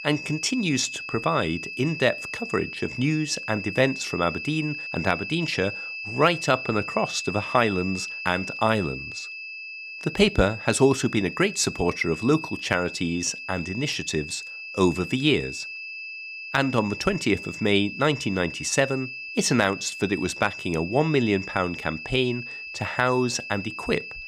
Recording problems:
high-pitched whine; loud; throughout; 2.5 kHz, 9 dB below the speech

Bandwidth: 18.5 kHz